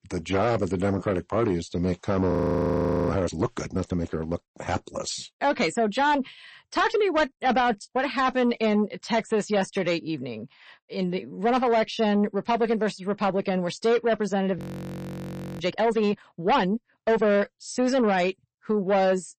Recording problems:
distortion; slight; 10 dB below the speech
garbled, watery; slightly; nothing above 15 kHz
audio freezing; at 2.5 s for 1 s and at 15 s for 1 s

